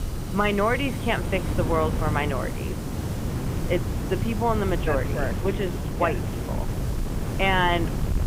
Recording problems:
high frequencies cut off; severe; nothing above 3.5 kHz
wind noise on the microphone; occasional gusts; 10 dB below the speech
hiss; noticeable; throughout; 15 dB below the speech
crackling; faint; at 5.5 s; 25 dB below the speech

